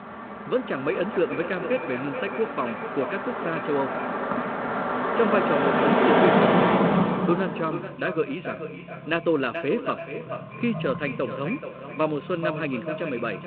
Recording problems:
echo of what is said; strong; throughout; 430 ms later, 8 dB below the speech
phone-call audio; nothing above 4 kHz
traffic noise; very loud; throughout; 3 dB above the speech

